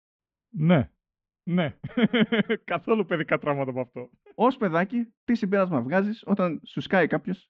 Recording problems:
muffled; very; fading above 3 kHz
high frequencies cut off; slight; nothing above 8 kHz

